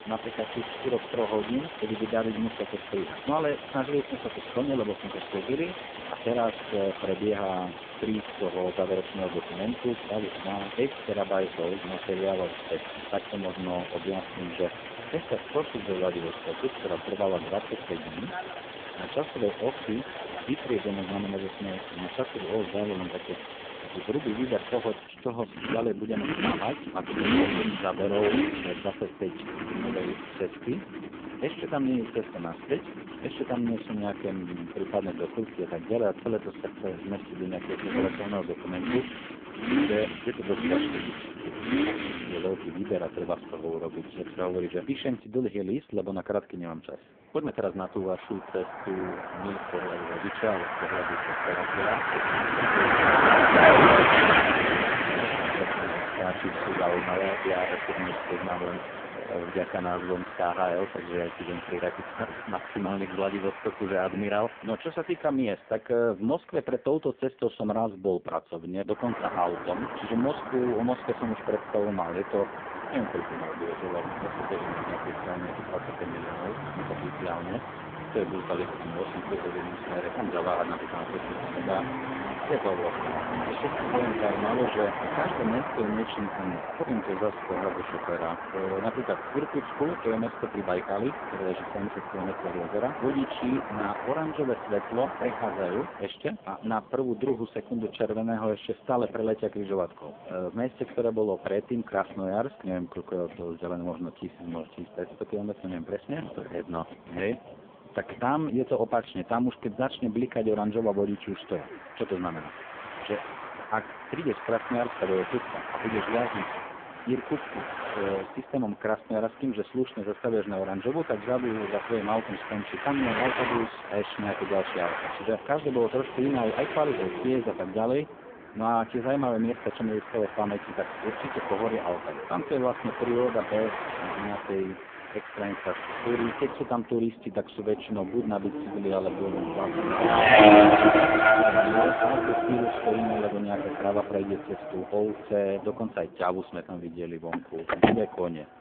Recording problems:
phone-call audio; poor line
traffic noise; very loud; throughout; 2 dB above the speech

